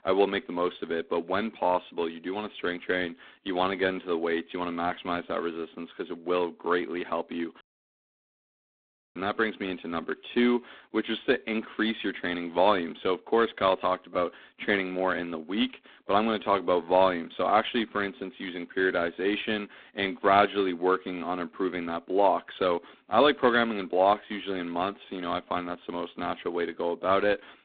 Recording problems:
phone-call audio; poor line; nothing above 3.5 kHz
audio cutting out; at 7.5 s for 1.5 s

